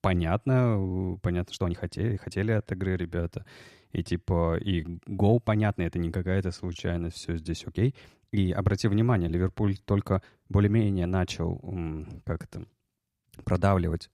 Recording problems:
uneven, jittery; strongly; from 1 to 13 s

